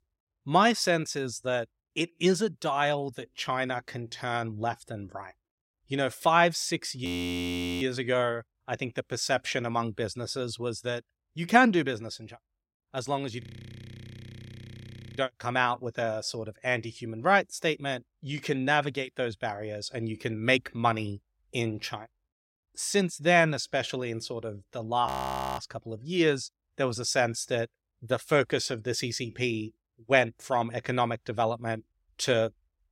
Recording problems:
audio freezing; at 7 s for 1 s, at 13 s for 2 s and at 25 s for 0.5 s

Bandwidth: 16 kHz